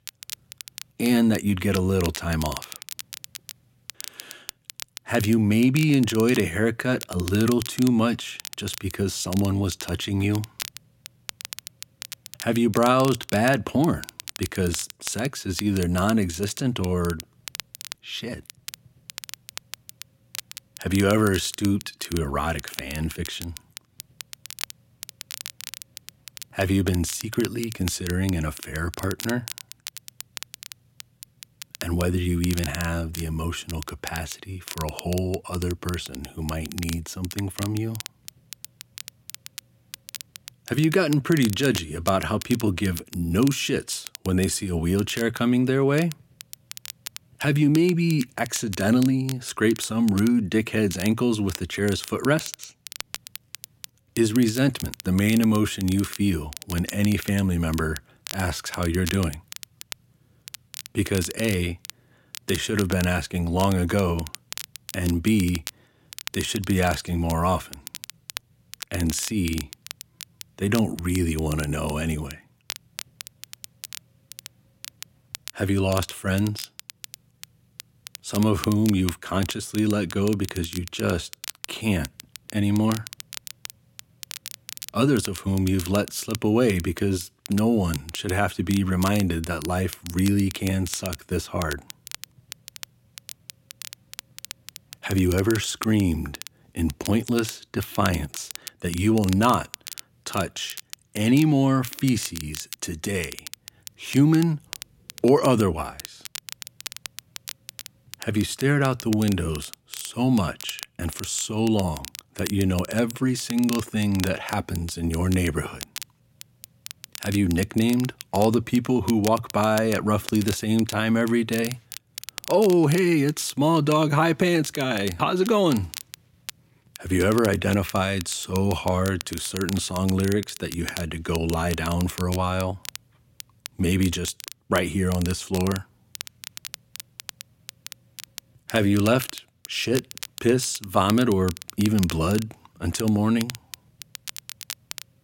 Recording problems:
crackle, like an old record; noticeable; 15 dB below the speech

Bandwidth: 16.5 kHz